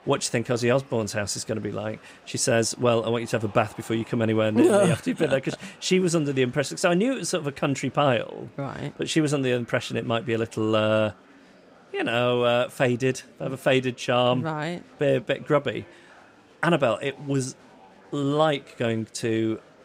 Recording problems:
murmuring crowd; faint; throughout; 25 dB below the speech

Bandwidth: 15.5 kHz